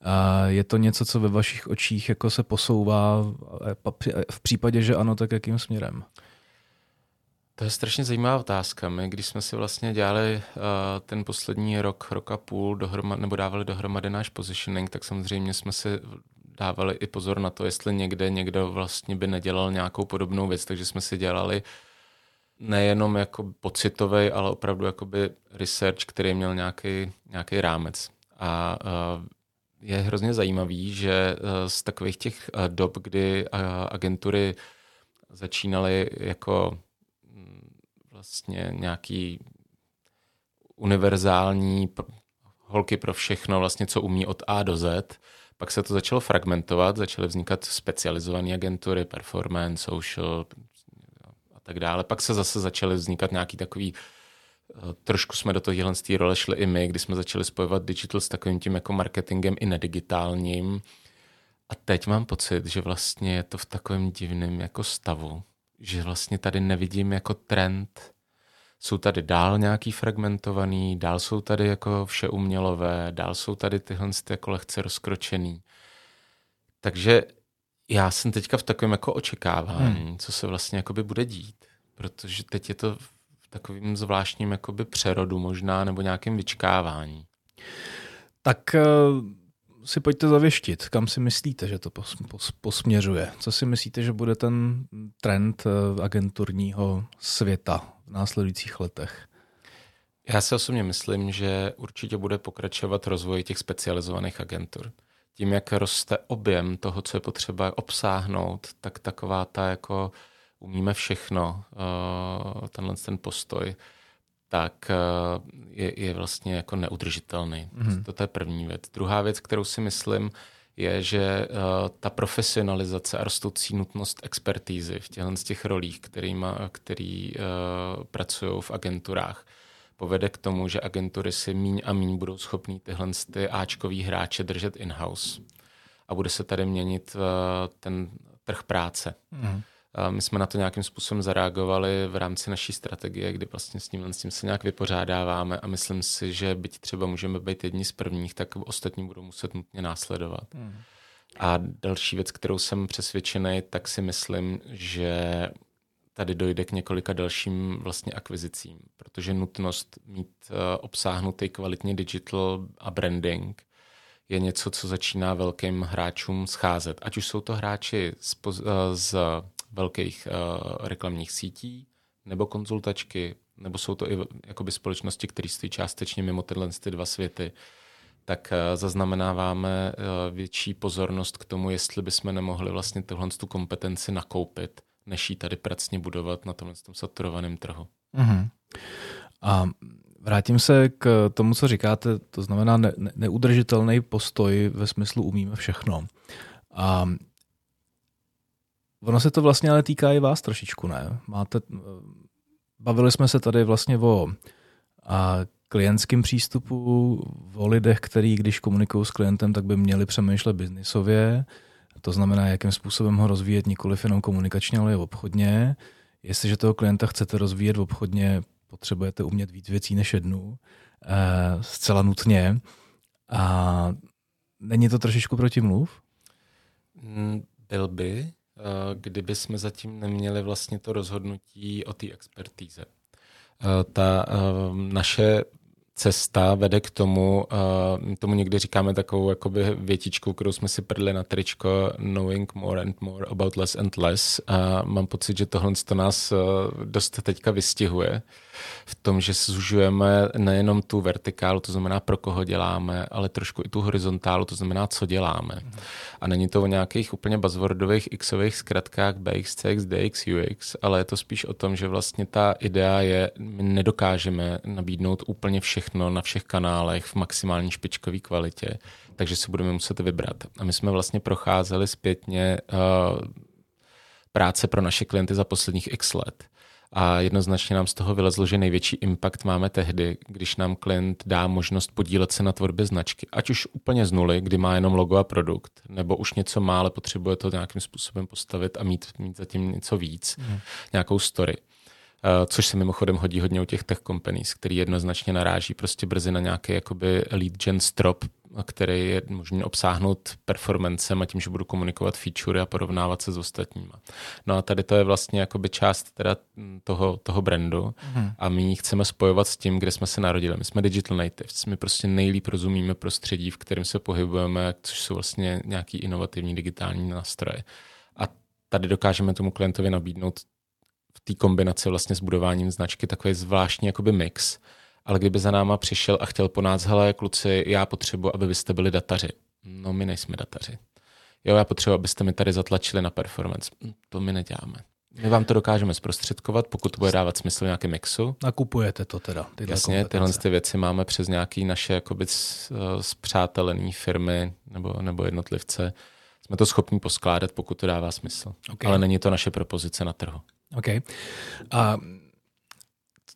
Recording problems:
none

